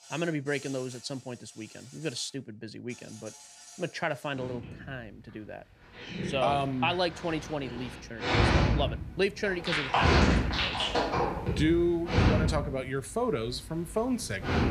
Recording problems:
animal sounds; very loud; throughout; 4 dB above the speech

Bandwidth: 14.5 kHz